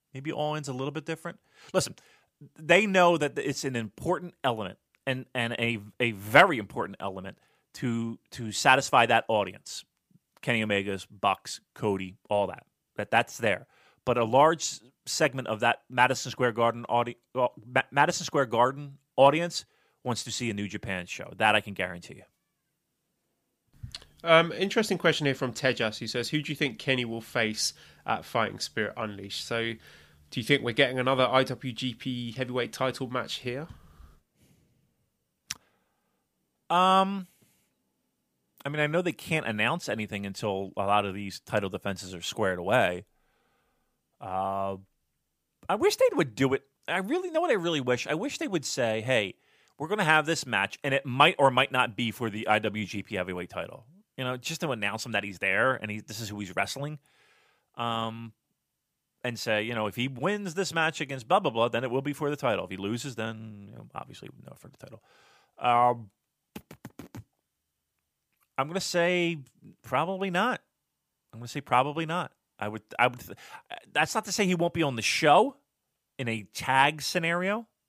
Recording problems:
none

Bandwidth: 15 kHz